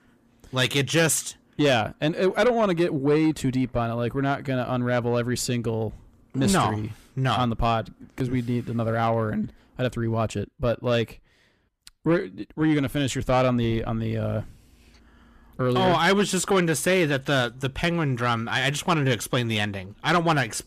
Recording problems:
distortion; slight; 10 dB below the speech

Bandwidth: 14.5 kHz